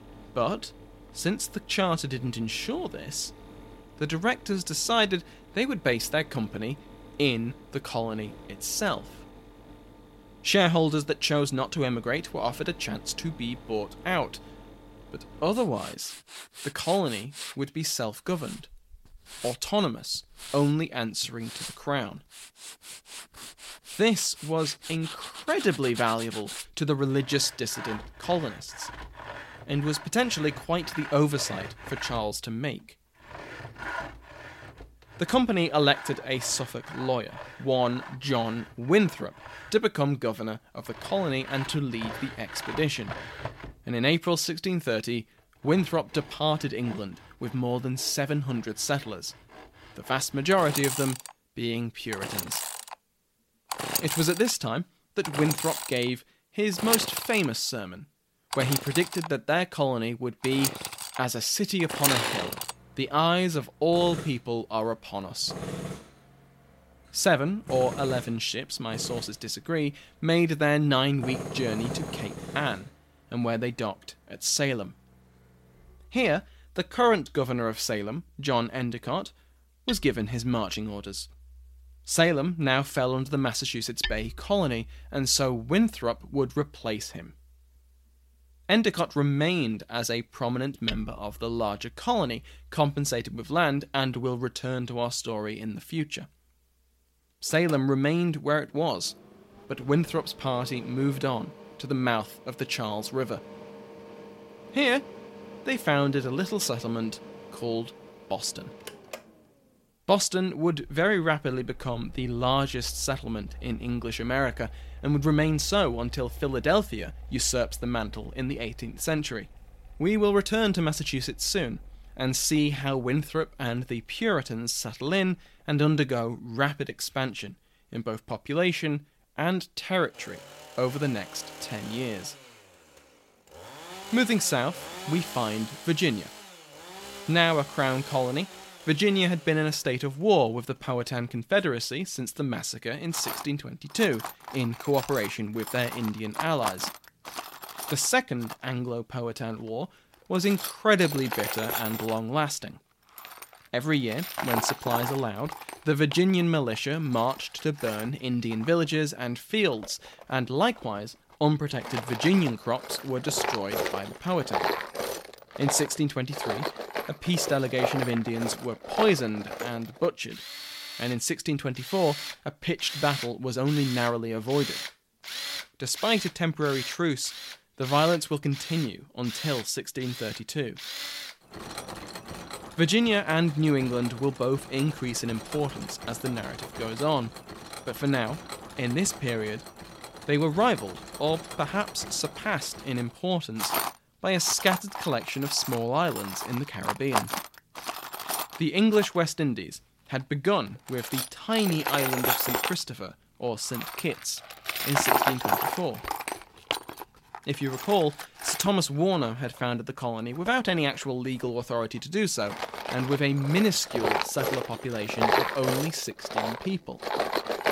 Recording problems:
machinery noise; loud; throughout; 8 dB below the speech

